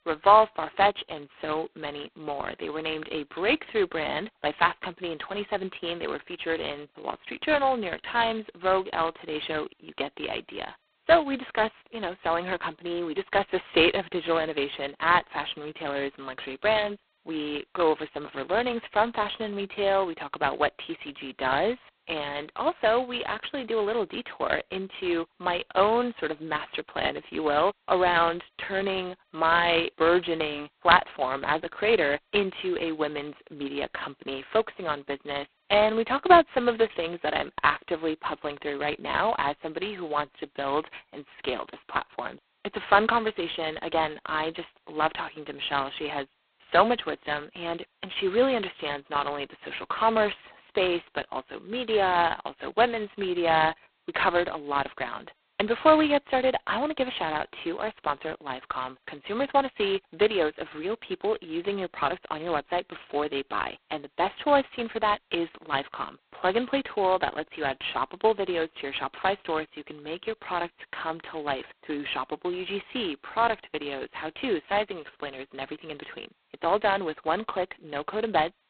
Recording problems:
phone-call audio; poor line; nothing above 4 kHz

